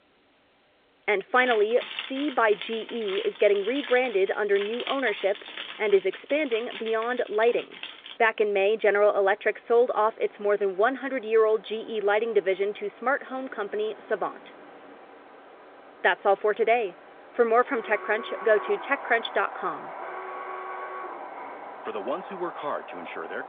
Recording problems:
phone-call audio; nothing above 3.5 kHz
wind in the background; noticeable; throughout; 15 dB below the speech
jangling keys; noticeable; from 1.5 to 8 s; peak 8 dB below the speech
alarm; faint; from 18 to 22 s; peak 10 dB below the speech

